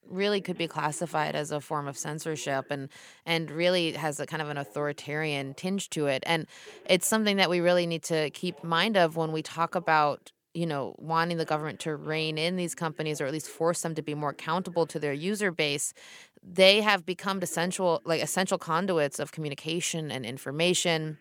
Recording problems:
voice in the background; faint; throughout; 25 dB below the speech

